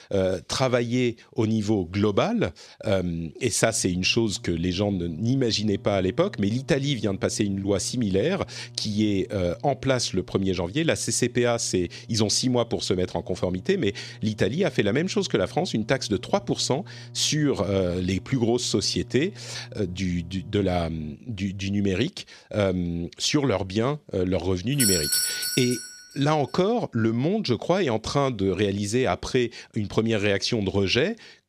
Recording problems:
electrical hum; faint; from 3.5 to 21 s; 60 Hz, 30 dB below the speech
doorbell; loud; from 25 to 26 s; peak 5 dB above the speech

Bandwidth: 13.5 kHz